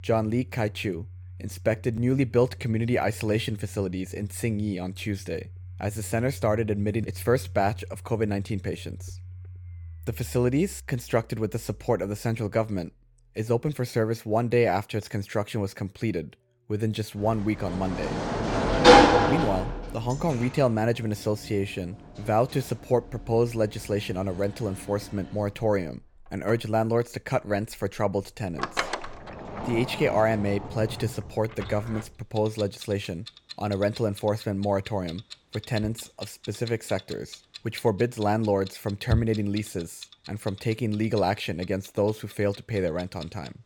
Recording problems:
household noises; loud; throughout; 1 dB below the speech

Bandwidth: 17 kHz